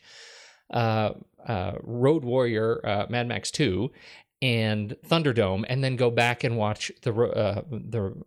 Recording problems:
none

